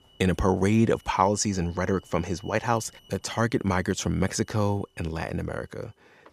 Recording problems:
alarms or sirens; faint; throughout; 30 dB below the speech

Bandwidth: 14.5 kHz